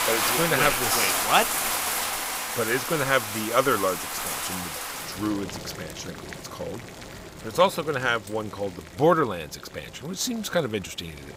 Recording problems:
household noises; loud; throughout; 1 dB below the speech

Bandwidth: 15.5 kHz